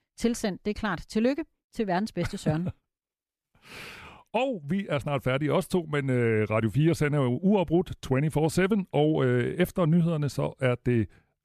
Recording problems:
none

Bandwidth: 14.5 kHz